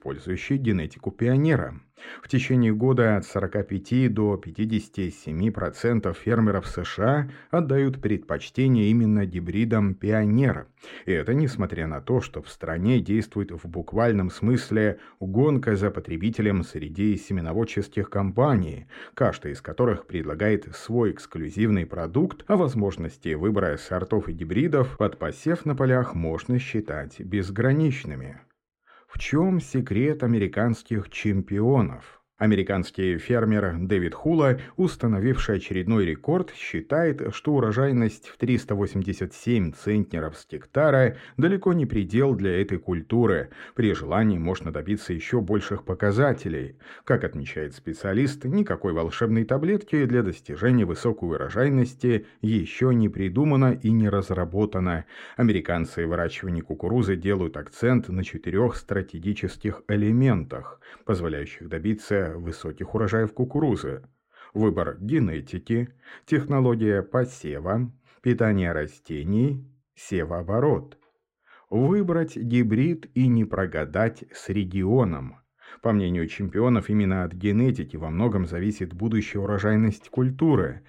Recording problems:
muffled; slightly; fading above 4 kHz

